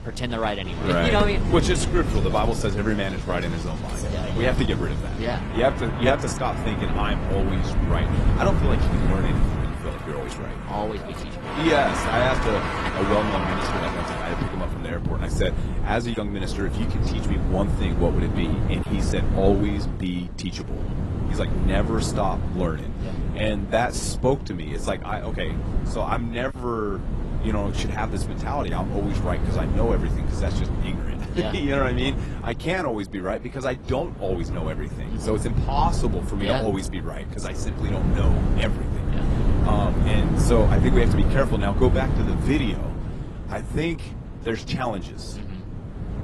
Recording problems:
garbled, watery; slightly; nothing above 11 kHz
wind noise on the microphone; heavy; 8 dB below the speech
traffic noise; loud; until 14 s; 5 dB below the speech

